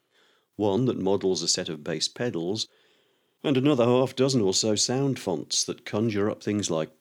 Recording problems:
none

